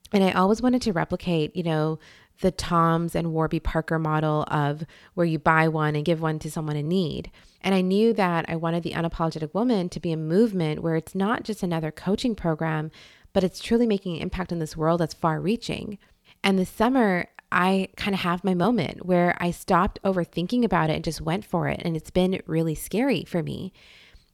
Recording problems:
none

